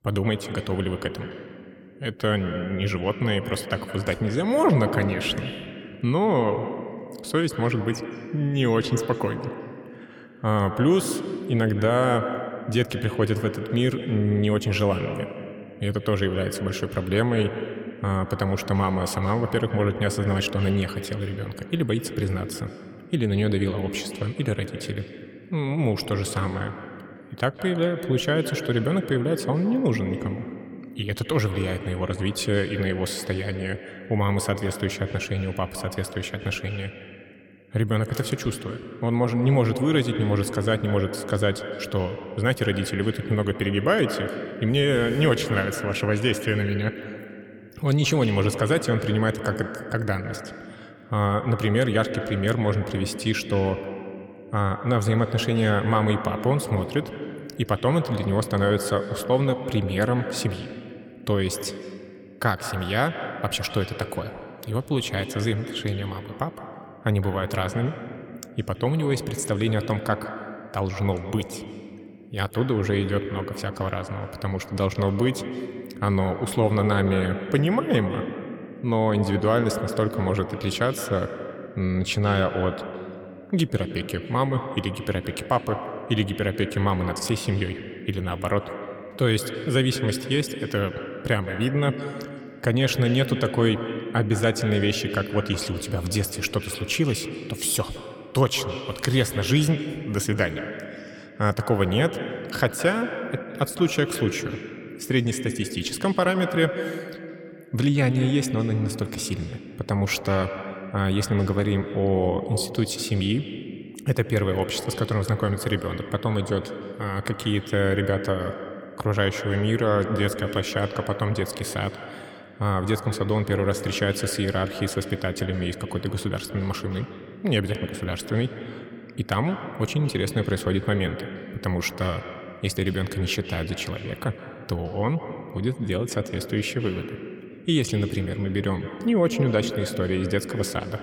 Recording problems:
echo of what is said; strong; throughout; 160 ms later, 9 dB below the speech

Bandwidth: 17.5 kHz